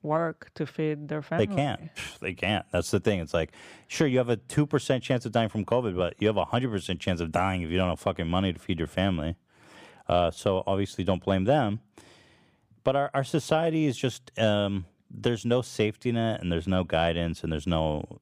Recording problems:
none

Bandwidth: 15 kHz